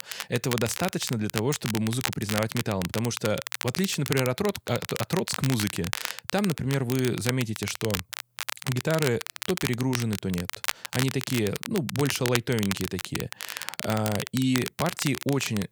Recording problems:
crackle, like an old record; loud; 5 dB below the speech

